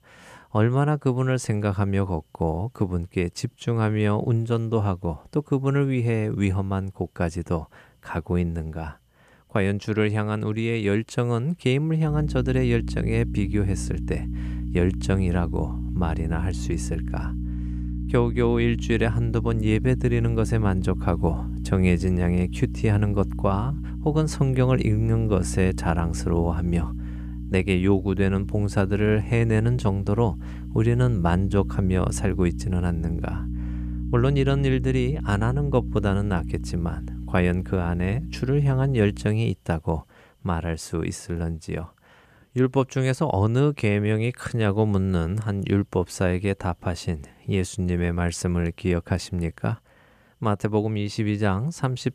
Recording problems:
electrical hum; noticeable; from 12 to 39 s; 60 Hz, 15 dB below the speech

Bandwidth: 14.5 kHz